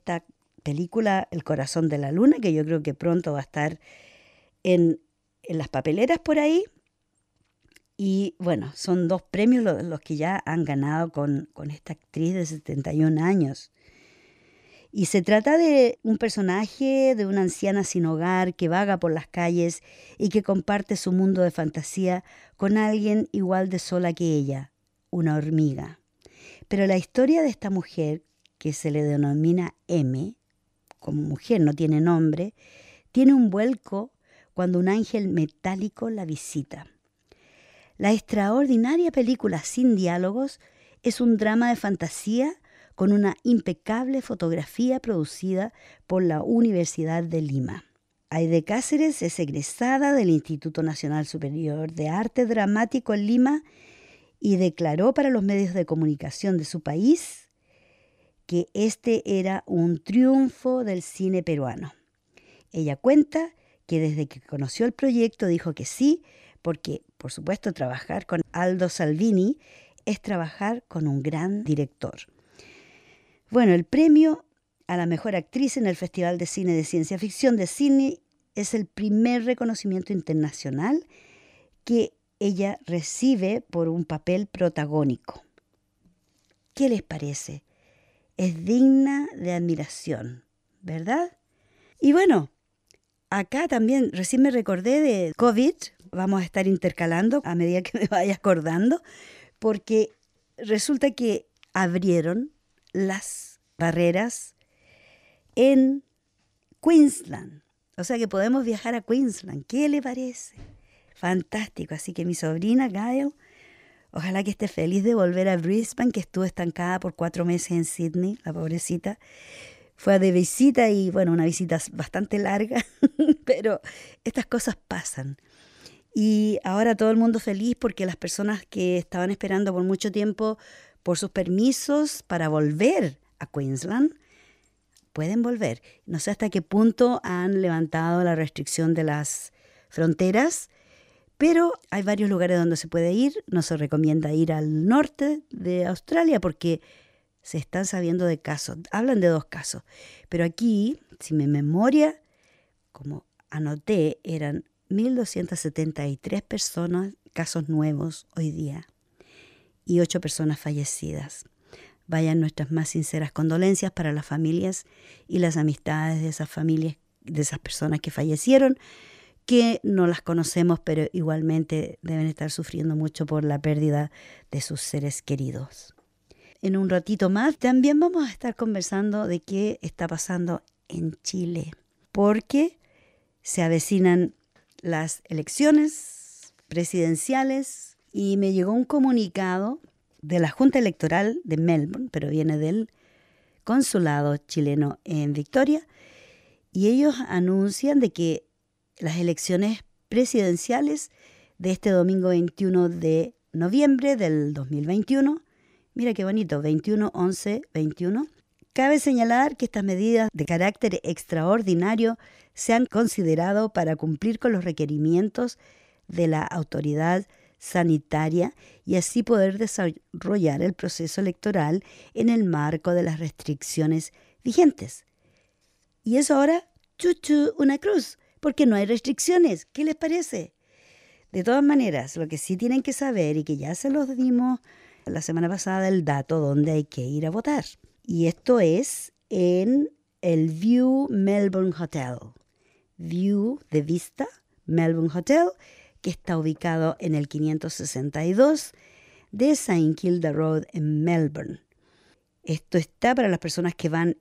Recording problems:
none

